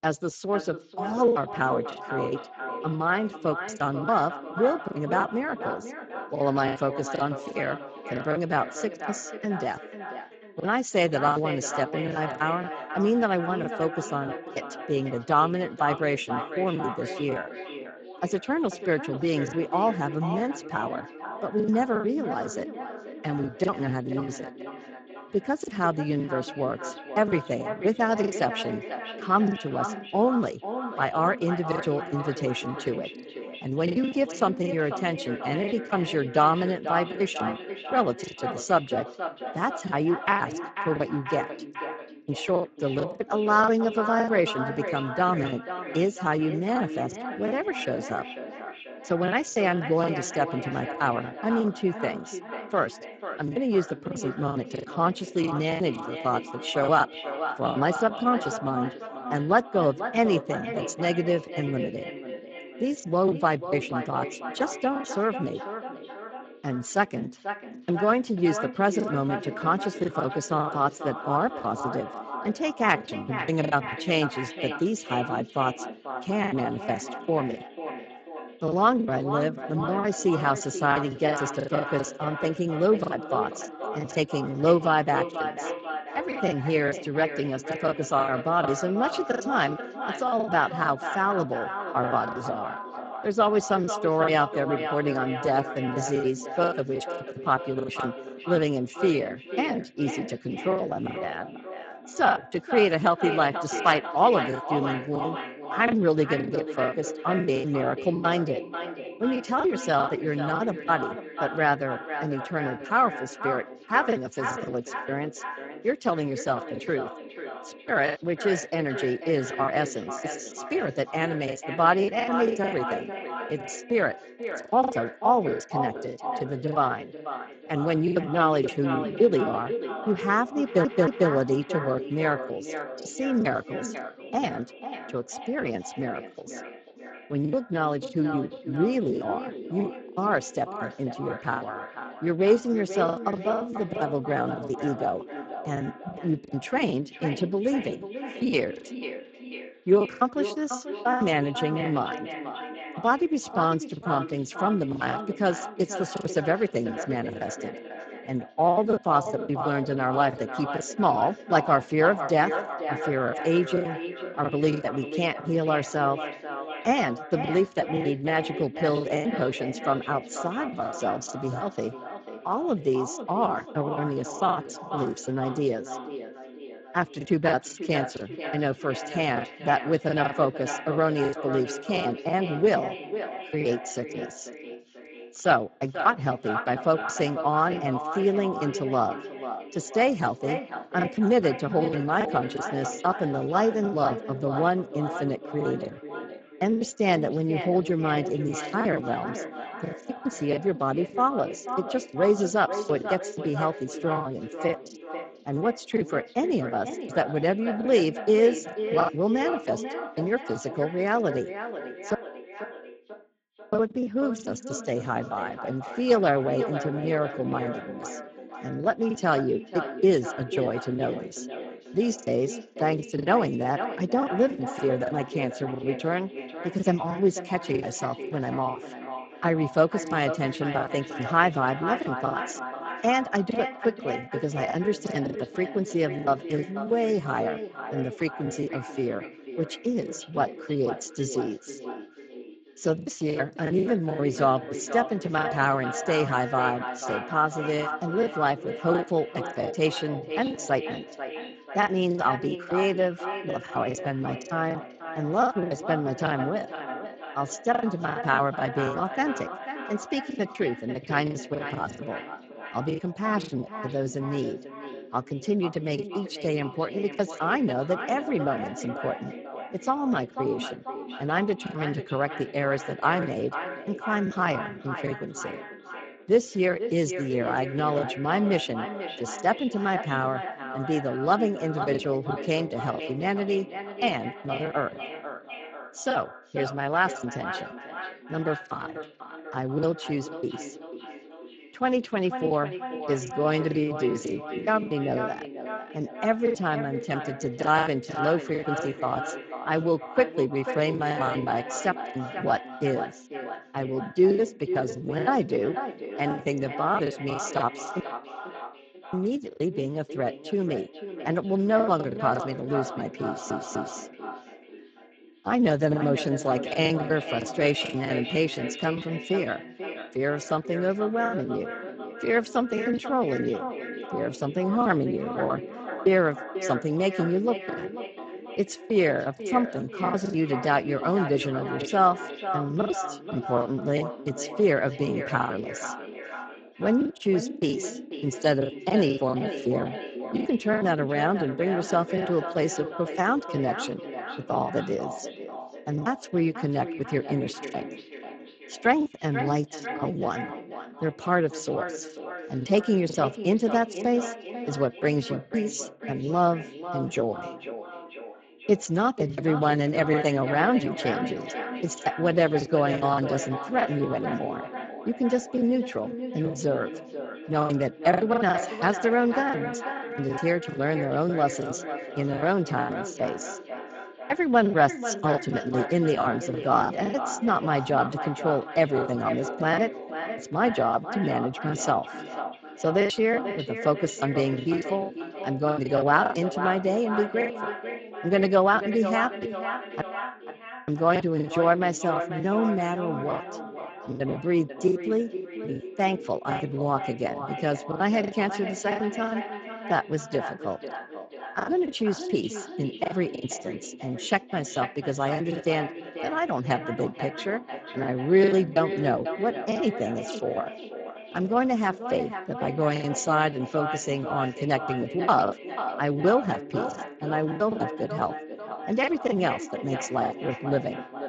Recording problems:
echo of what is said; strong; throughout; 490 ms later, 9 dB below the speech
garbled, watery; badly; nothing above 7.5 kHz
choppy; very; 11% of the speech affected
audio stuttering; at 2:11 and at 5:13
audio cutting out; at 3:32 for 1.5 s, at 5:08 for 1 s and at 6:30 for 1 s

